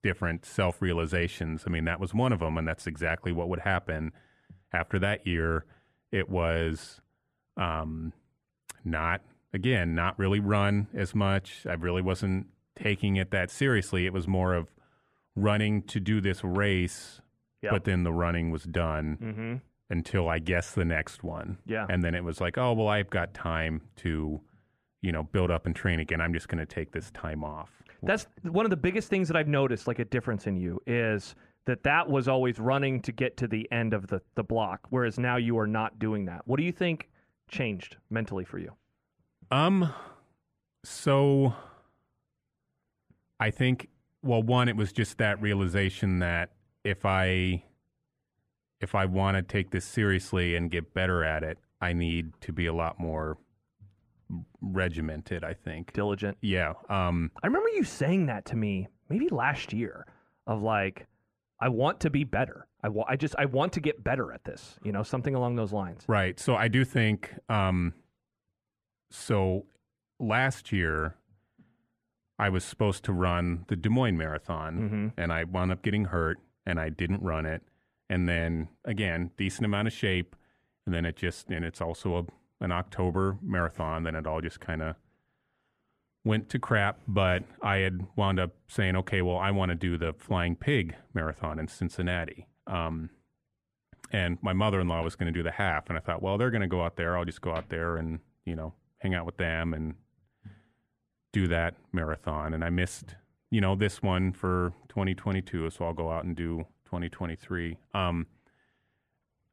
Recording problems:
muffled; slightly; fading above 3.5 kHz

